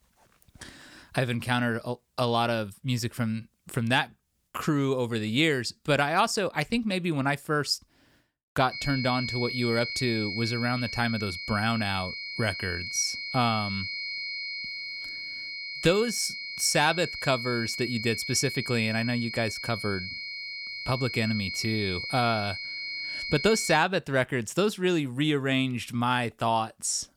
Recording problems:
high-pitched whine; loud; from 8.5 to 24 s; 2 kHz, 5 dB below the speech

